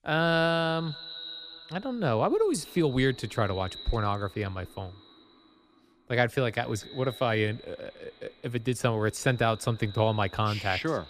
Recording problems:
echo of what is said; noticeable; throughout; 150 ms later, 15 dB below the speech

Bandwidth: 15 kHz